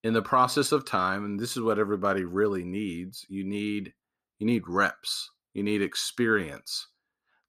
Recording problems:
none

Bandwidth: 14.5 kHz